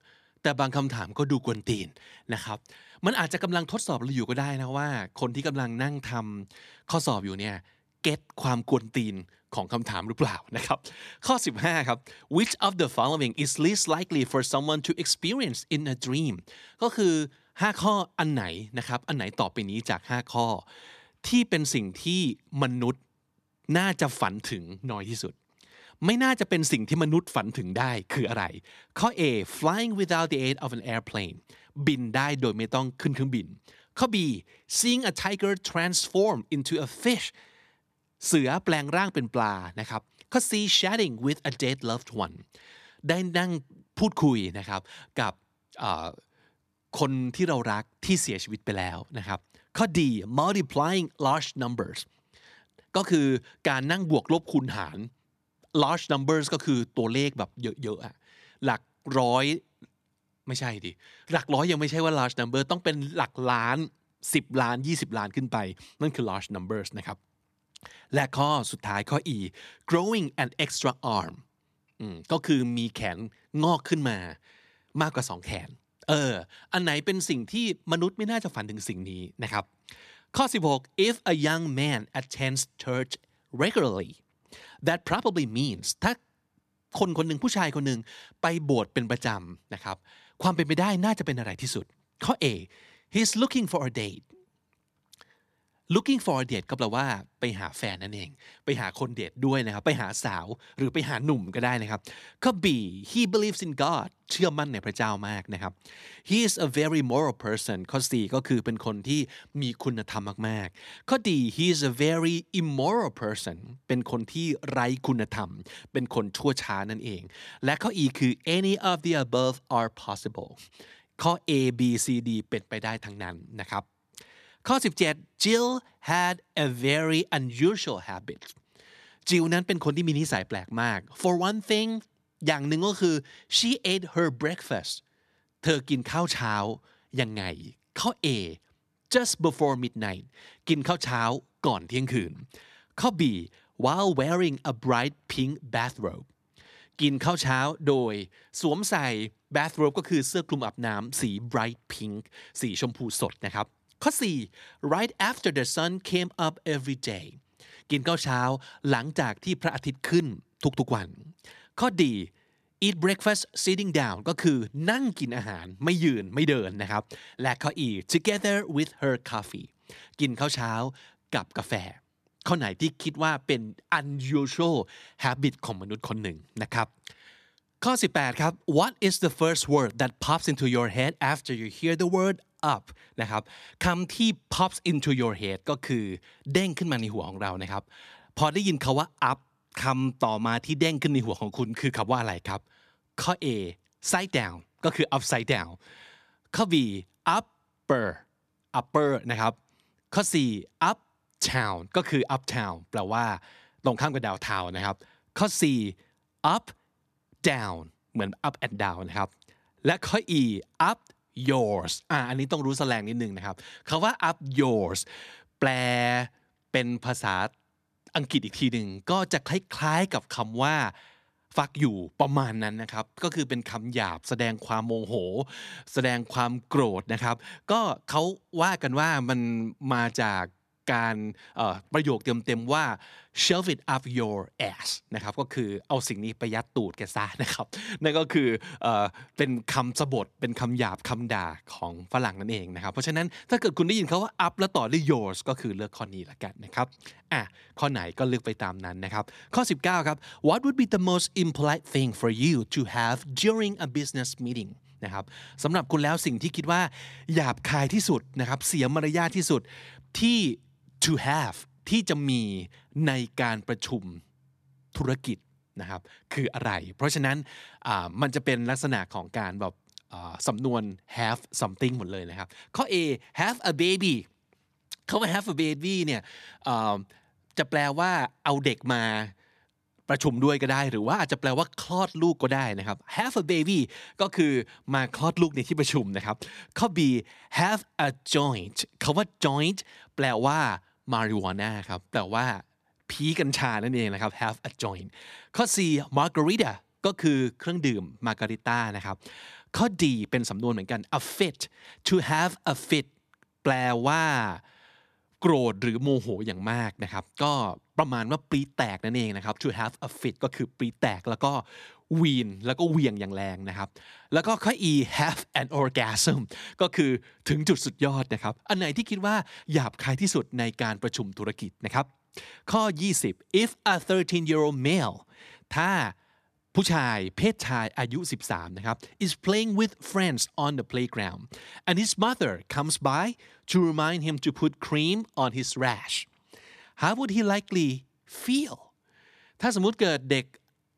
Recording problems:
none

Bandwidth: 14 kHz